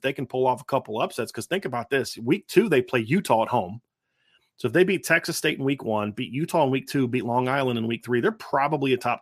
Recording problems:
none

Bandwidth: 14.5 kHz